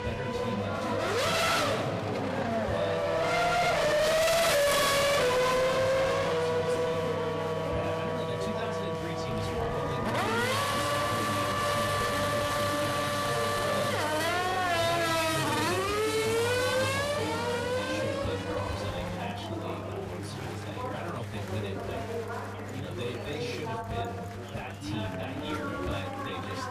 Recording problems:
distortion; heavy; 13% of the sound clipped
off-mic speech; far
room echo; very slight; dies away in 0.2 s
traffic noise; very loud; throughout; 10 dB above the speech
chatter from many people; very loud; throughout; 2 dB above the speech
electrical hum; noticeable; throughout; 50 Hz, 10 dB below the speech

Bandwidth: 14.5 kHz